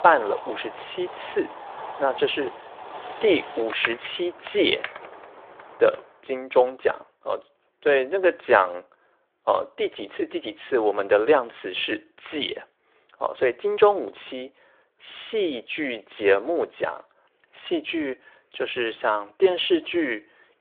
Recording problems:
phone-call audio; nothing above 3.5 kHz
wind in the background; noticeable; until 6 s; 10 dB below the speech

